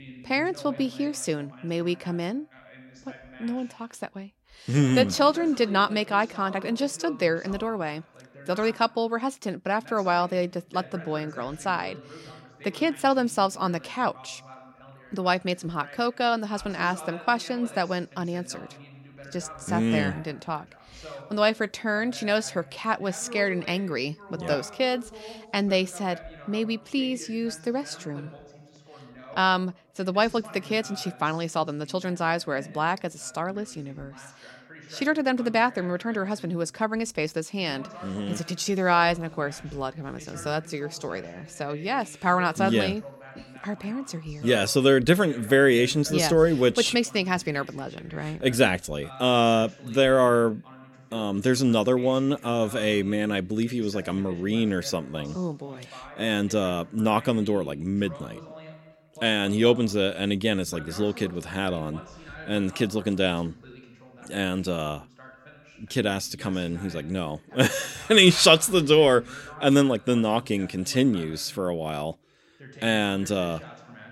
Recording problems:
voice in the background; faint; throughout; 20 dB below the speech

